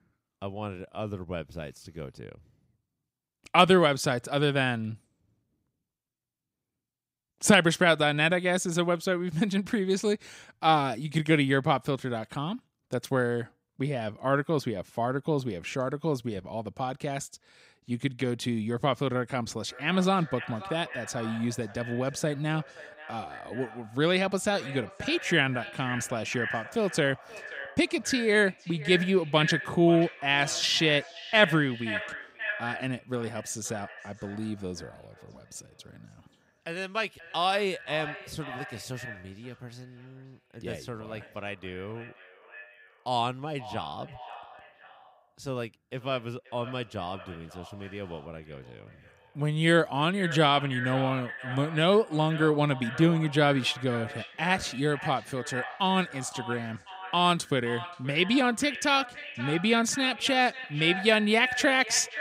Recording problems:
echo of what is said; strong; from 20 s on; 530 ms later, 10 dB below the speech

